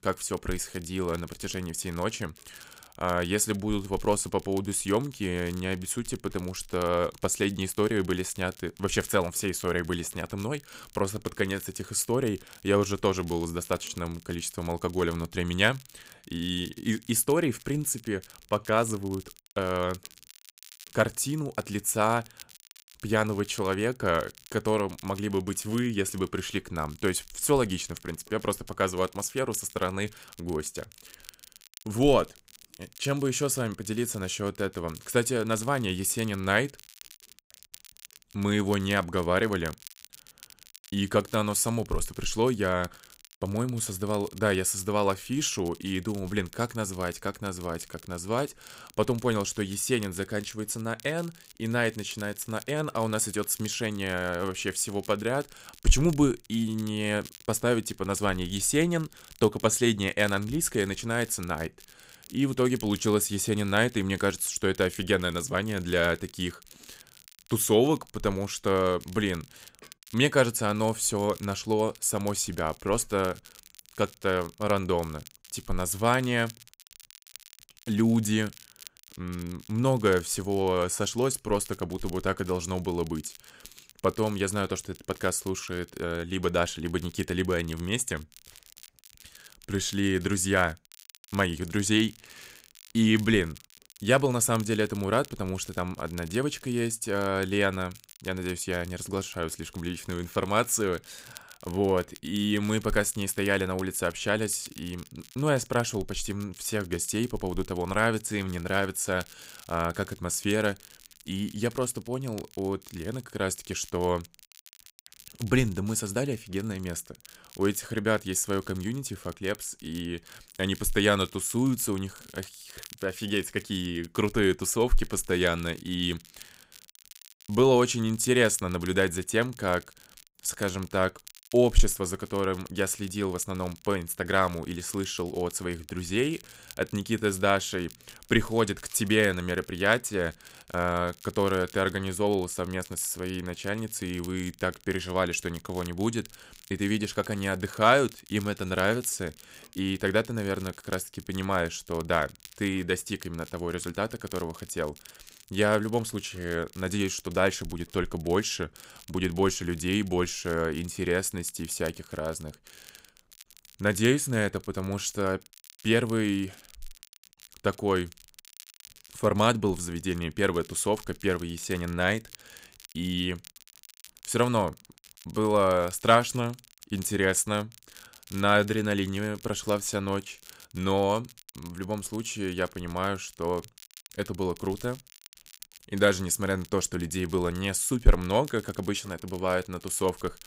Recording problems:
crackle, like an old record; faint; 20 dB below the speech

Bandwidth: 15.5 kHz